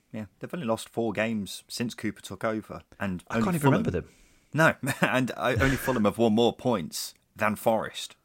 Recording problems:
none

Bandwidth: 16 kHz